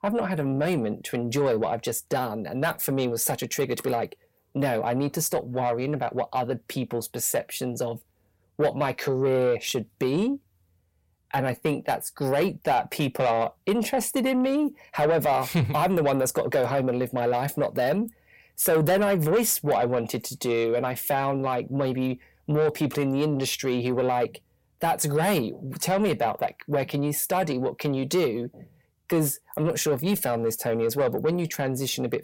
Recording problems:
distortion; slight; 10 dB below the speech

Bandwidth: 16.5 kHz